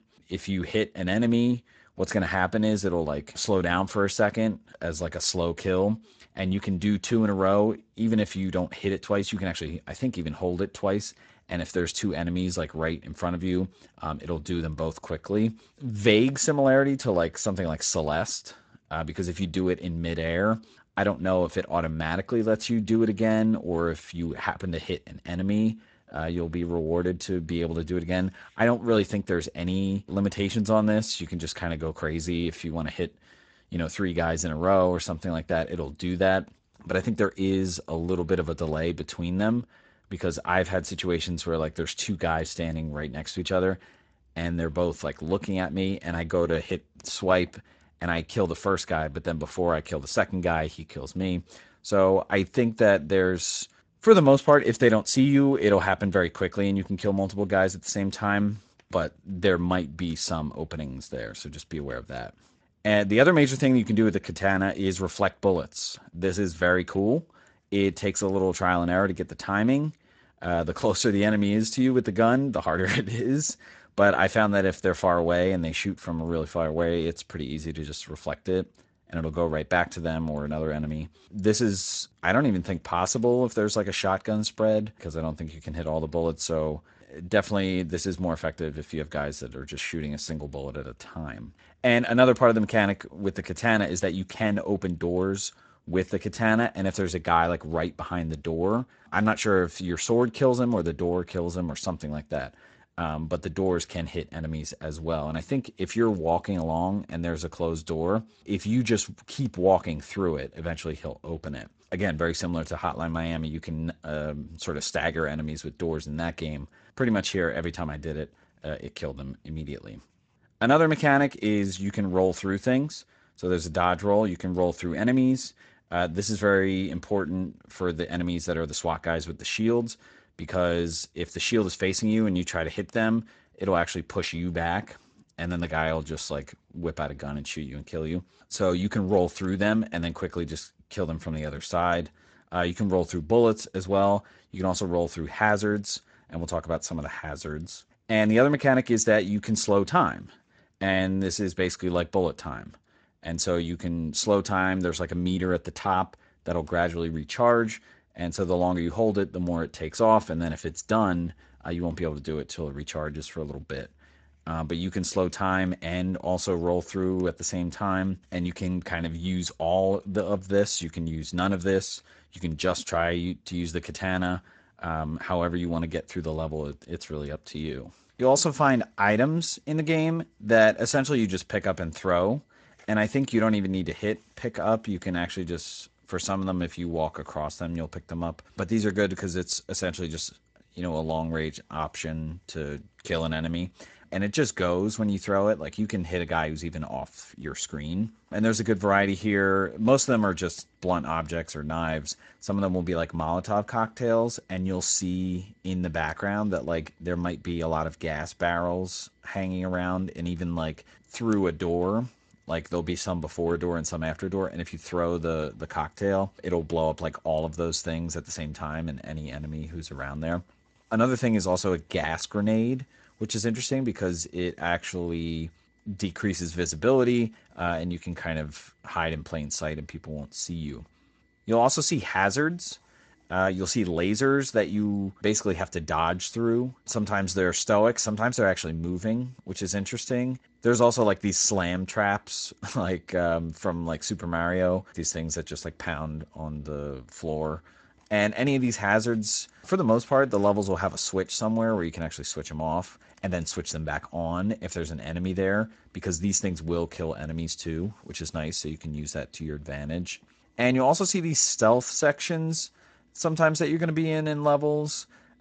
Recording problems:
garbled, watery; slightly; nothing above 7.5 kHz

